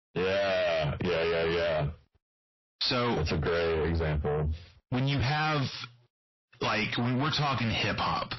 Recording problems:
distortion; heavy; 6 dB below the speech
squashed, flat; heavily
garbled, watery; slightly; nothing above 5.5 kHz

